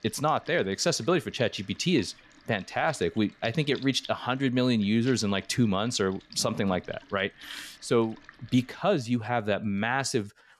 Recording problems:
household noises; faint; throughout; 20 dB below the speech

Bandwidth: 13.5 kHz